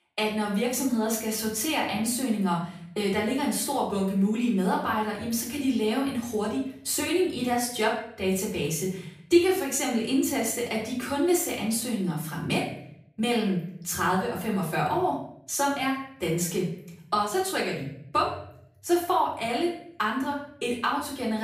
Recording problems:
off-mic speech; far
room echo; noticeable; dies away in 0.6 s
abrupt cut into speech; at the end

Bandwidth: 15 kHz